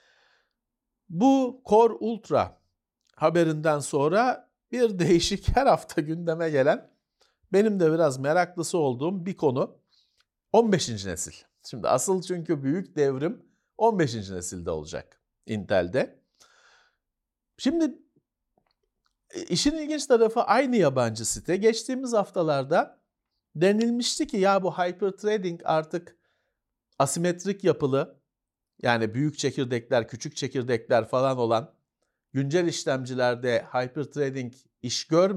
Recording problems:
abrupt cut into speech; at the end

